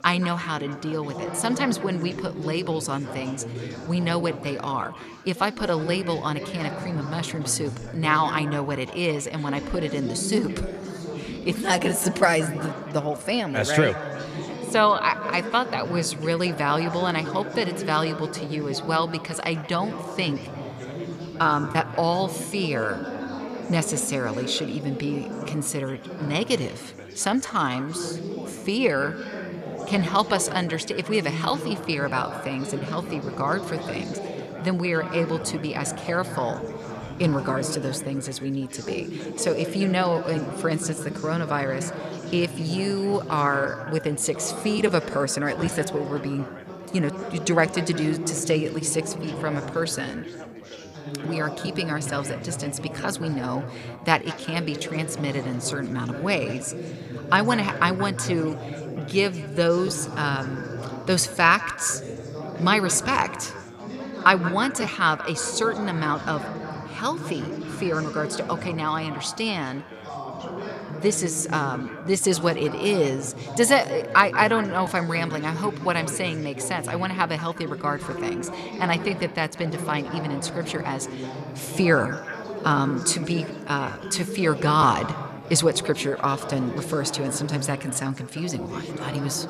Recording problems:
echo of what is said; noticeable; throughout; 180 ms later, 15 dB below the speech
background chatter; loud; throughout; 4 voices, 9 dB below the speech

